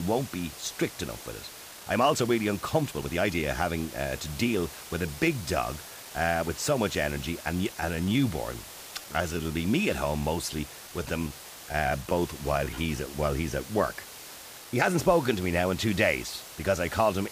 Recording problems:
hiss; noticeable; throughout; 15 dB below the speech
abrupt cut into speech; at the start
uneven, jittery; strongly; from 1.5 to 17 s

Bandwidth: 15 kHz